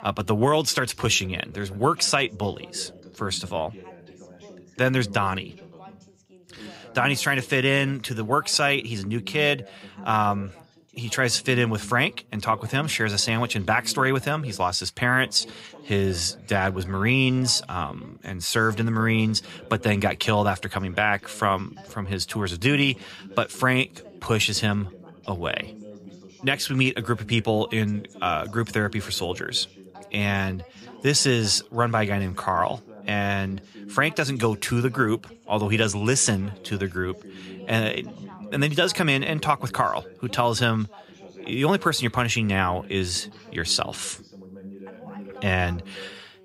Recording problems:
background chatter; faint; throughout; 2 voices, 20 dB below the speech

